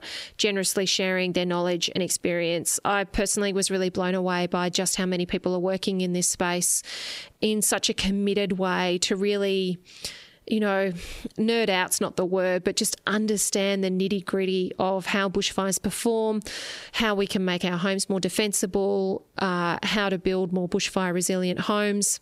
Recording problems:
squashed, flat; somewhat

